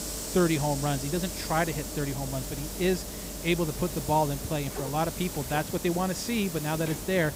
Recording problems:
hiss; loud; throughout; 6 dB below the speech

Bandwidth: 15.5 kHz